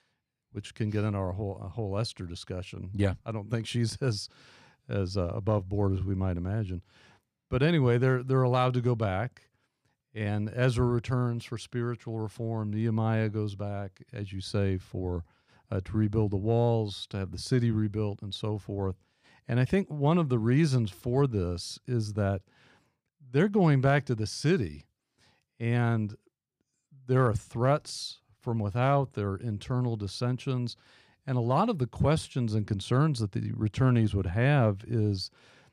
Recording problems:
none

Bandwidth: 14.5 kHz